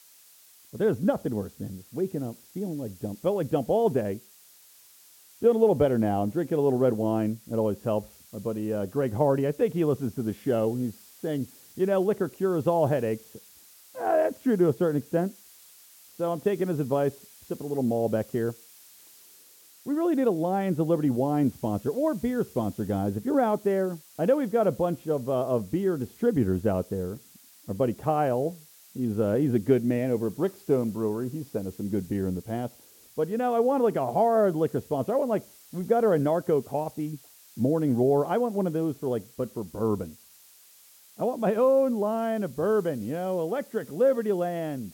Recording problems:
muffled; very; fading above 1.5 kHz
hiss; faint; throughout; 25 dB below the speech

